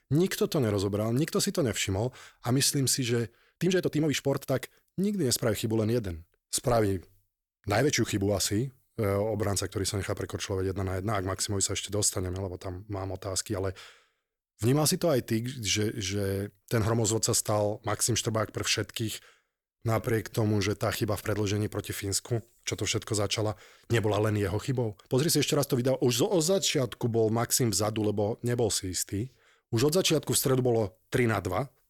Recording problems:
uneven, jittery; strongly; from 2 to 27 s

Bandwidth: 18.5 kHz